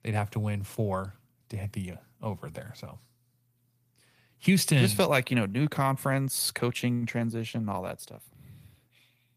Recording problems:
garbled, watery; slightly; nothing above 15 kHz

